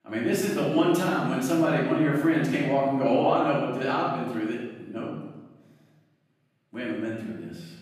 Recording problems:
off-mic speech; far
room echo; noticeable; dies away in 1.1 s

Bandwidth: 14.5 kHz